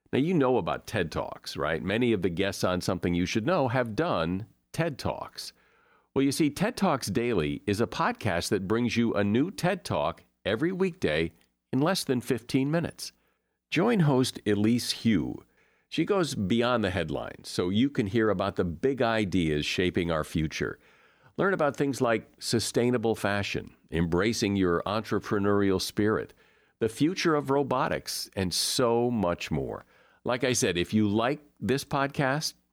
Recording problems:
none

